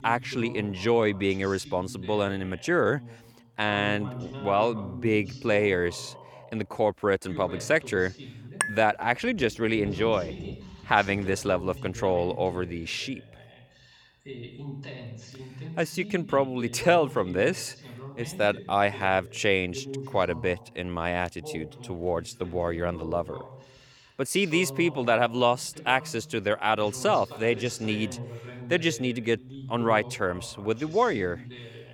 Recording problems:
voice in the background; noticeable; throughout; 15 dB below the speech
clattering dishes; noticeable; at 8.5 s; peak 3 dB below the speech

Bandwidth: 19 kHz